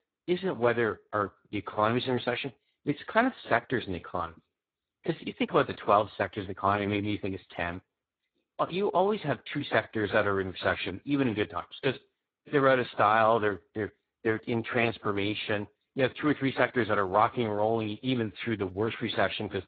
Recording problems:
garbled, watery; badly; nothing above 4 kHz

